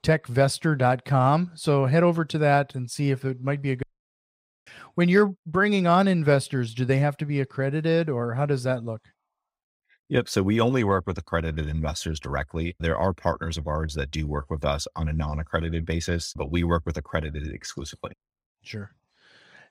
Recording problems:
audio cutting out; at 4 s for 1 s

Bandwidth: 15.5 kHz